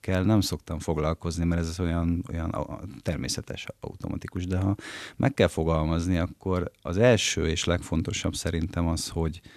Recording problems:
none

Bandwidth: 13.5 kHz